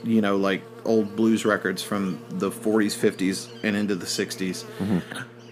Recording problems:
electrical hum; noticeable; throughout; 60 Hz, 15 dB below the speech

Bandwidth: 15 kHz